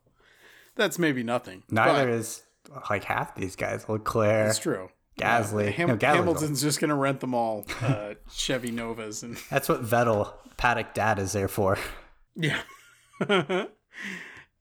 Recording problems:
none

